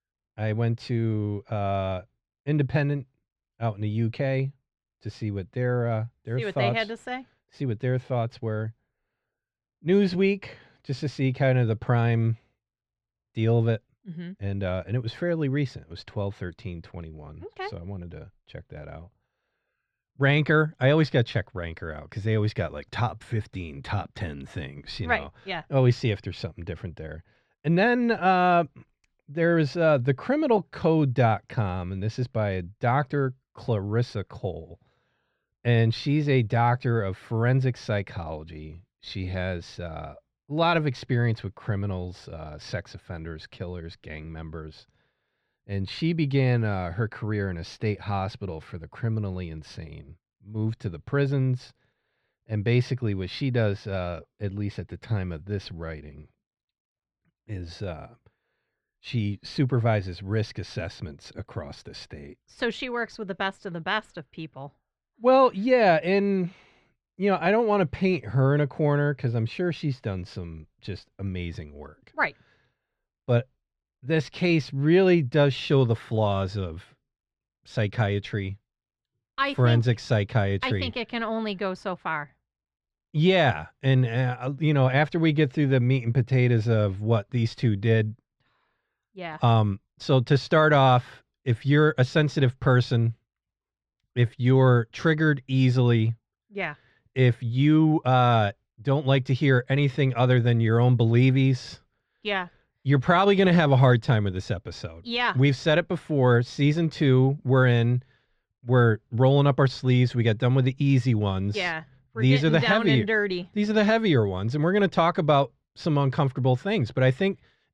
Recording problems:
muffled; slightly; fading above 2.5 kHz

